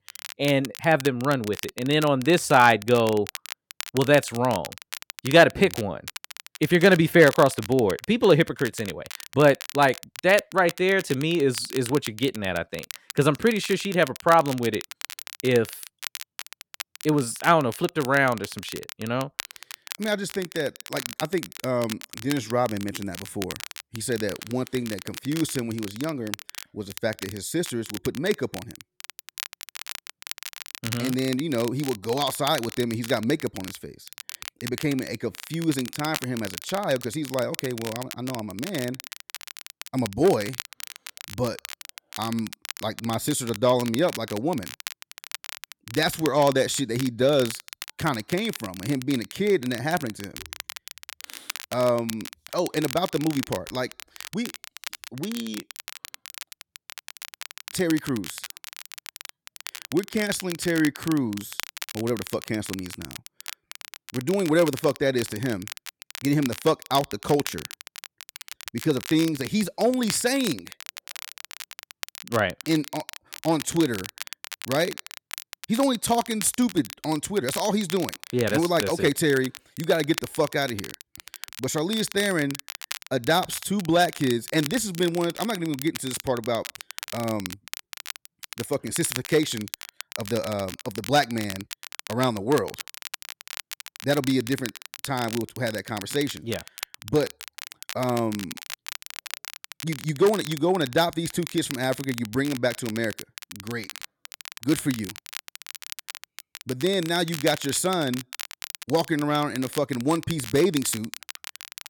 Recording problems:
crackle, like an old record; noticeable; 10 dB below the speech

